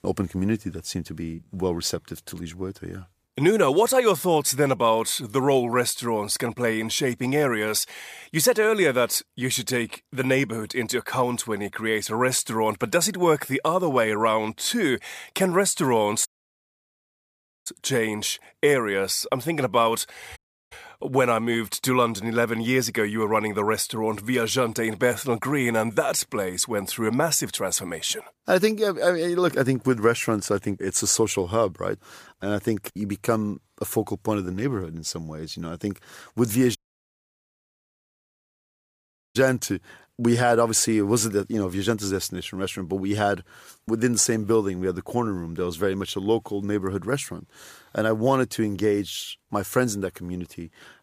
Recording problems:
audio cutting out; at 16 s for 1.5 s, at 20 s and at 37 s for 2.5 s

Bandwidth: 15 kHz